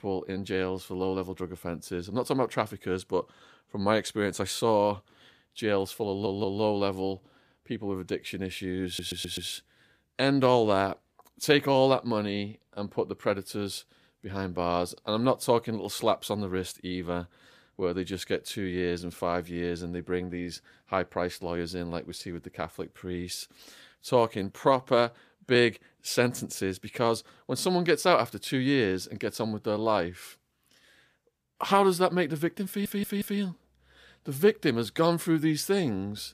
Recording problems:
audio stuttering; at 6 s, at 9 s and at 33 s

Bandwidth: 15 kHz